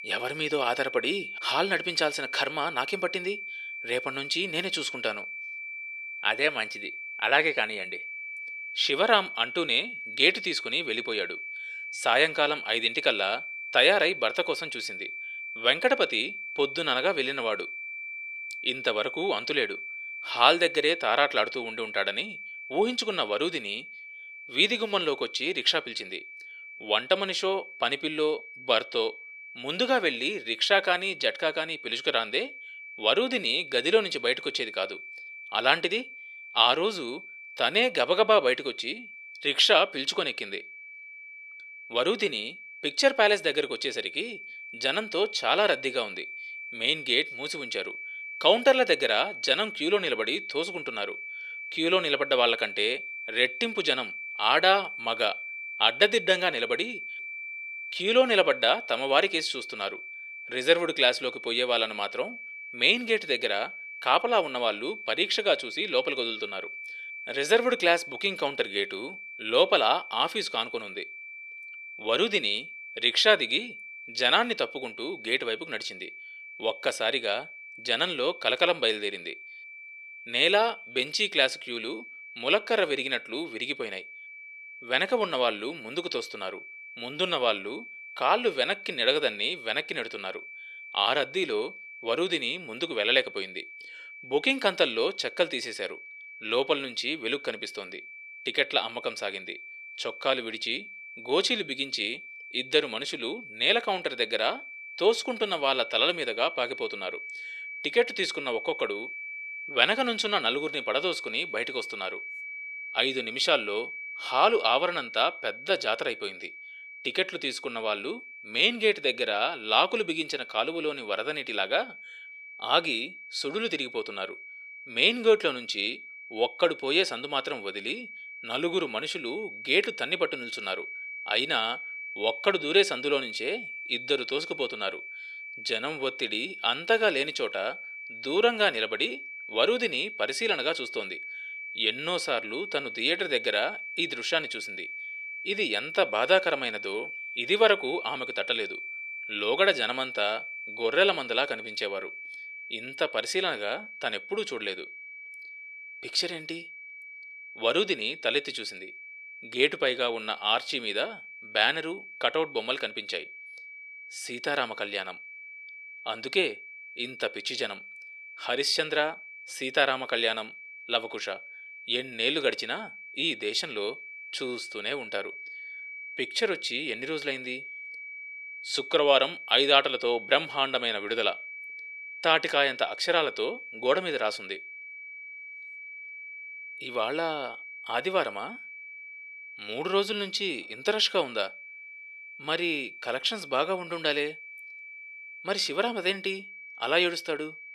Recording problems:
thin; somewhat; fading below 500 Hz
high-pitched whine; noticeable; throughout; 2.5 kHz, 10 dB below the speech

